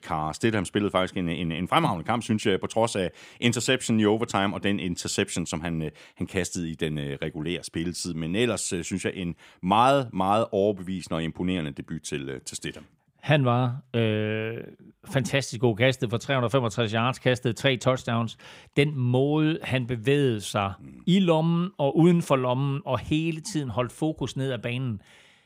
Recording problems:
none

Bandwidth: 15.5 kHz